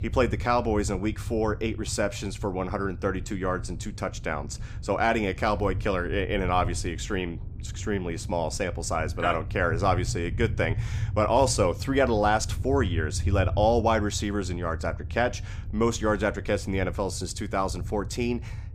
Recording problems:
low rumble; faint; throughout; 20 dB below the speech

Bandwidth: 15.5 kHz